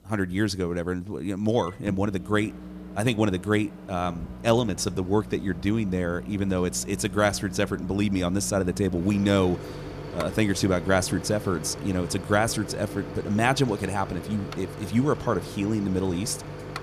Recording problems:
household noises; noticeable; throughout; 10 dB below the speech

